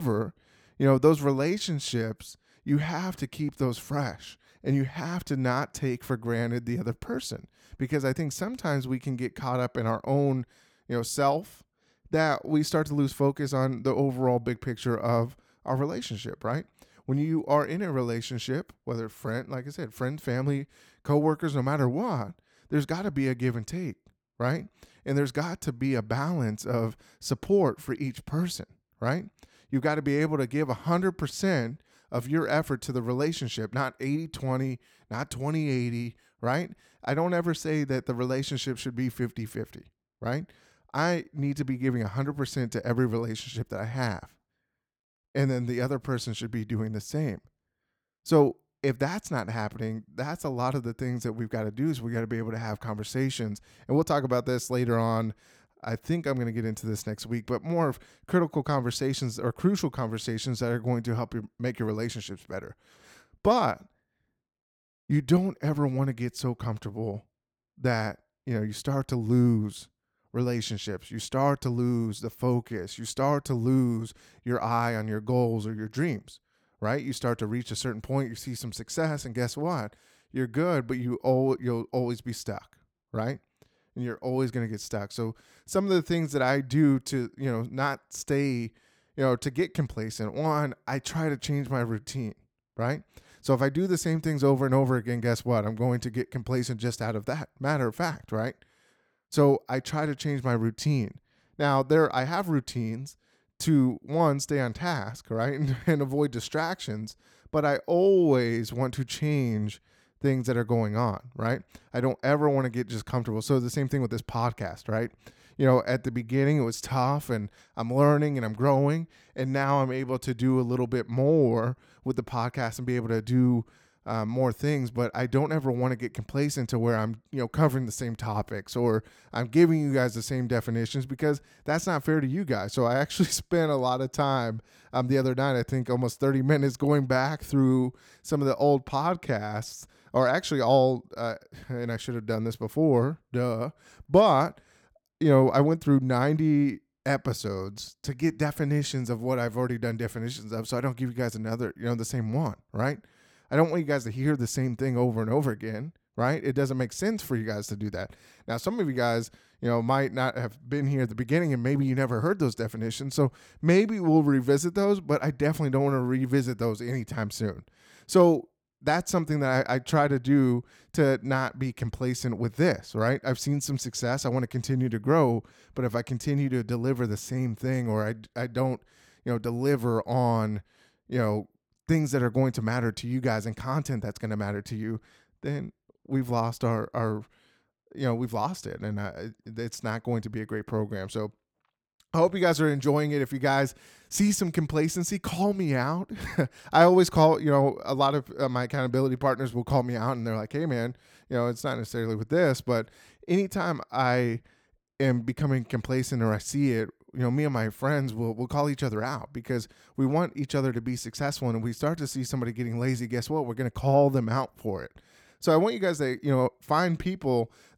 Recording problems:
abrupt cut into speech; at the start

